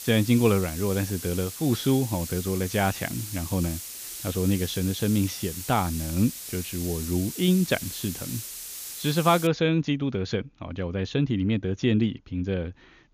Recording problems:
high frequencies cut off; noticeable; nothing above 7 kHz
hiss; loud; until 9.5 s; 9 dB below the speech

